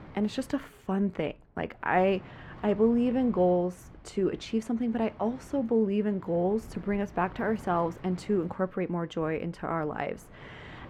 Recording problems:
muffled; very; fading above 3.5 kHz
wind noise on the microphone; occasional gusts; 20 dB below the speech

